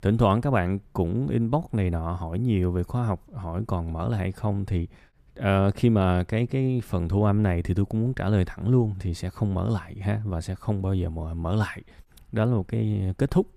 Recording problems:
none

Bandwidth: 15 kHz